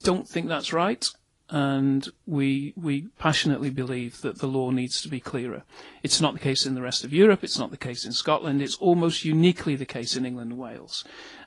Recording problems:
garbled, watery; slightly

